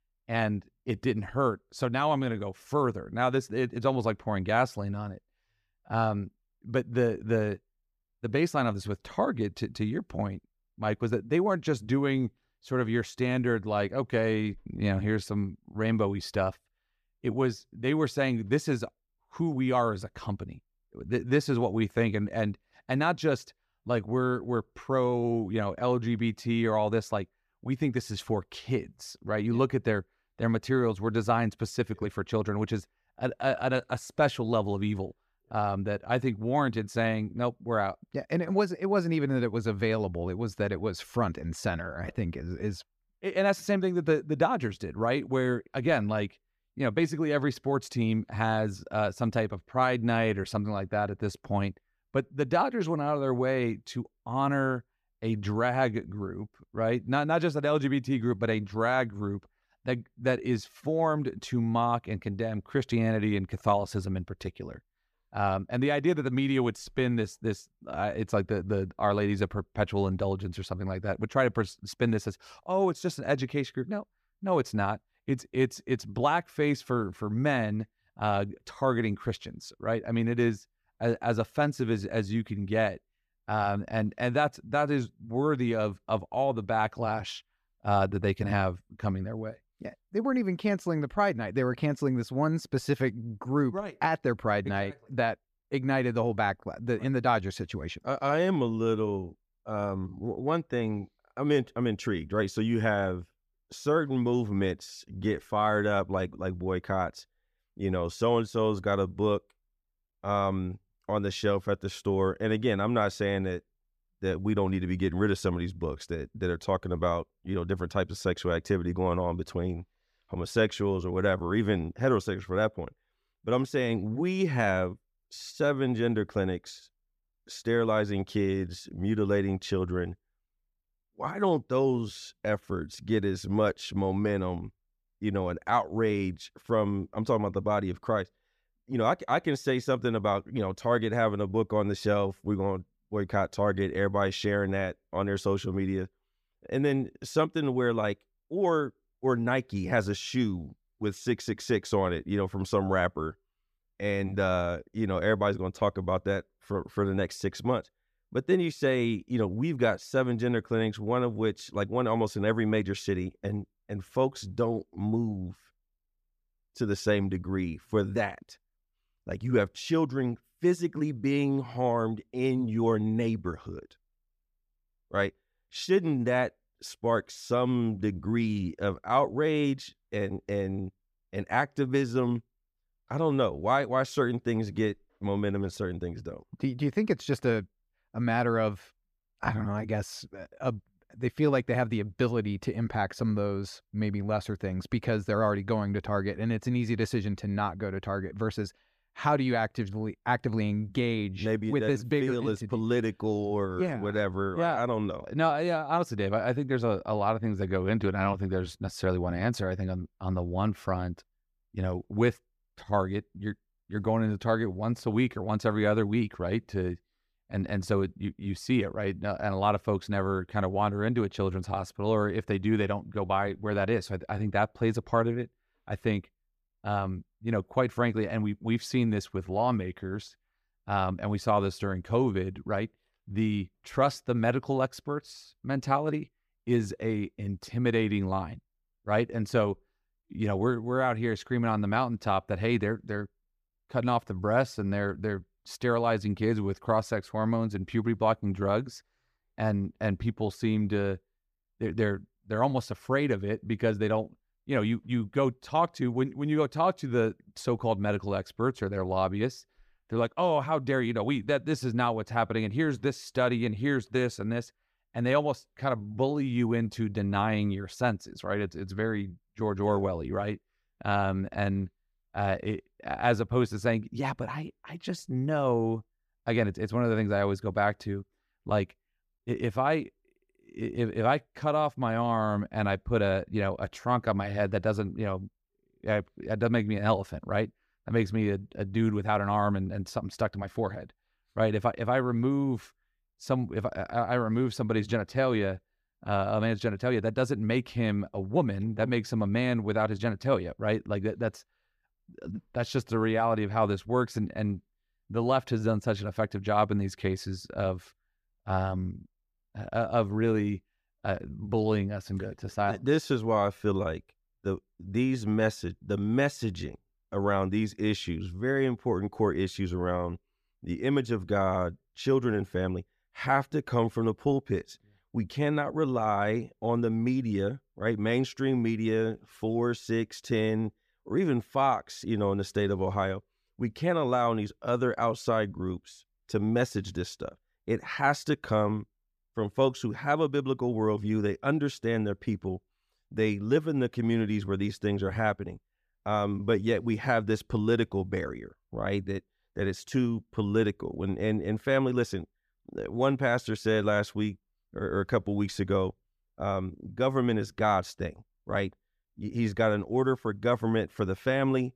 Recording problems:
none

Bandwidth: 14.5 kHz